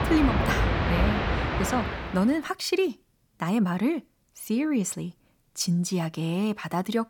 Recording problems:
train or aircraft noise; very loud; until 2 s; 1 dB above the speech

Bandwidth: 18 kHz